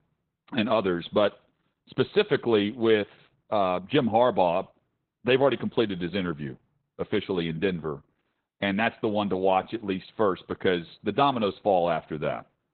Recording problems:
garbled, watery; badly; nothing above 4 kHz

